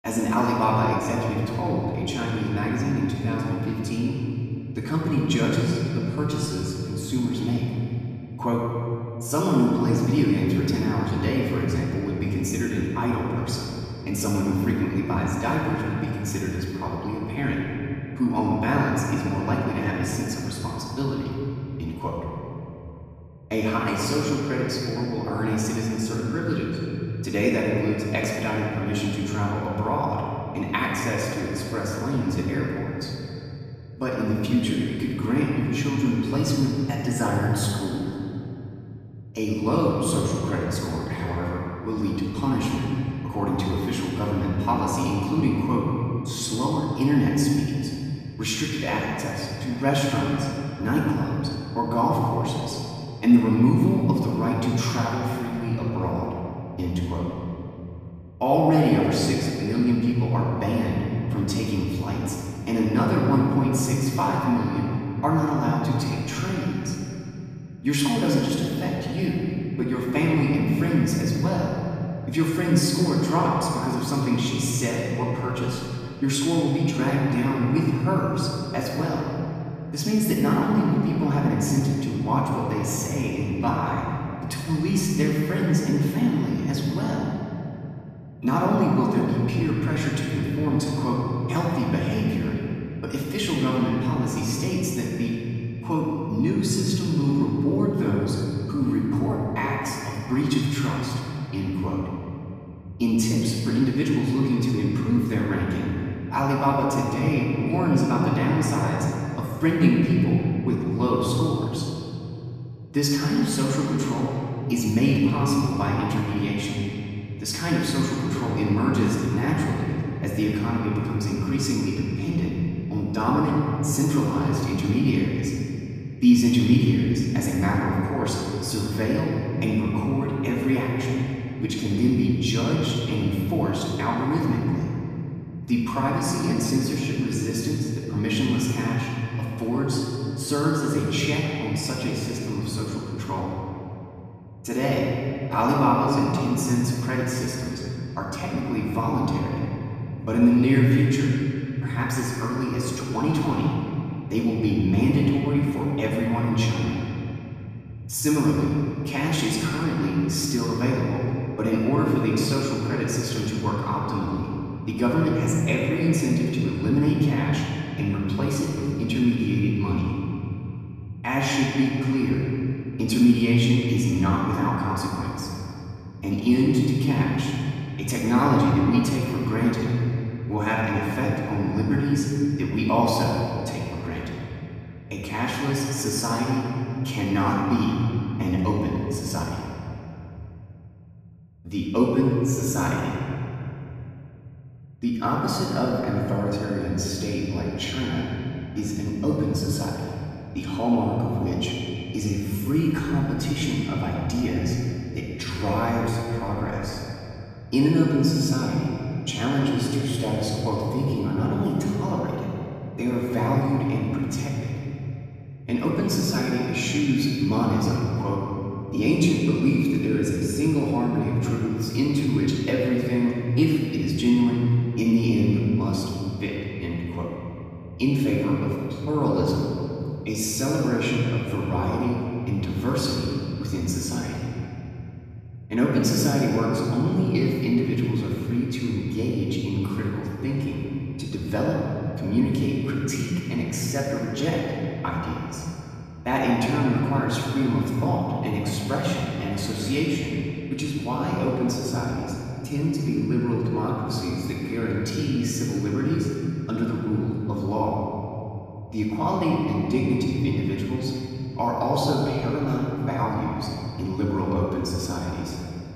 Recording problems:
room echo; strong; dies away in 3 s
off-mic speech; far

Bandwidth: 14.5 kHz